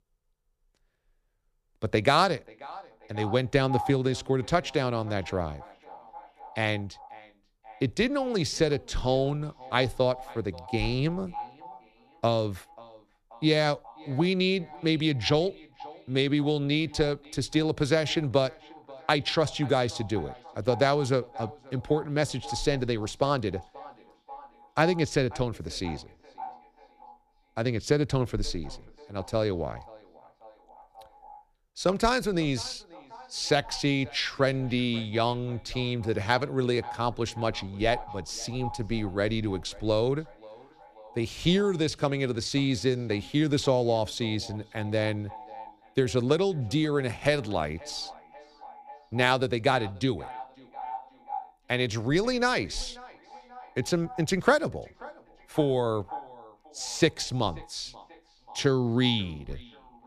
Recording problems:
echo of what is said; faint; throughout; 540 ms later, 20 dB below the speech

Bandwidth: 14.5 kHz